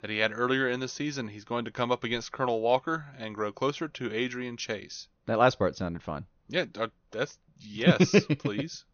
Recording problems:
high frequencies cut off; noticeable; nothing above 6.5 kHz

